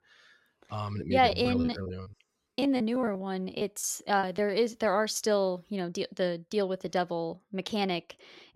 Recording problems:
choppy; very; from 1.5 to 4.5 s; 19% of the speech affected

